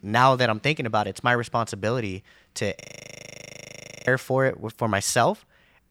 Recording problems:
audio freezing; at 3 s for 1.5 s

